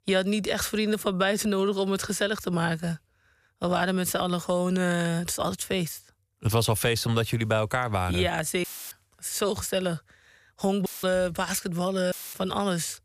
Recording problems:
audio cutting out; filled with static; at 8.5 s, at 11 s and at 12 s

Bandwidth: 14.5 kHz